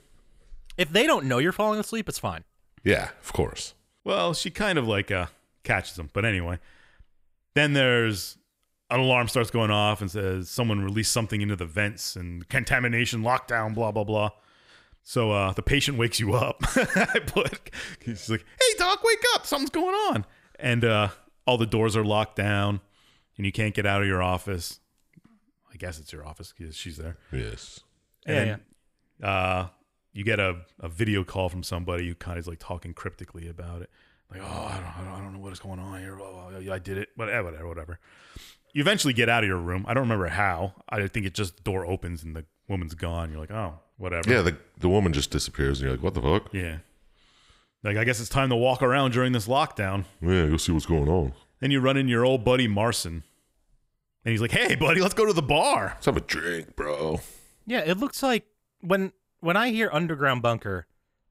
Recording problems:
none

